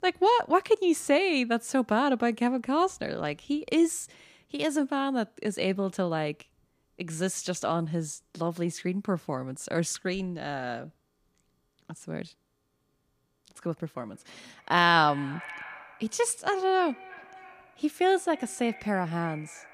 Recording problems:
echo of what is said; noticeable; from 13 s on; 310 ms later, 20 dB below the speech

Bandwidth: 15 kHz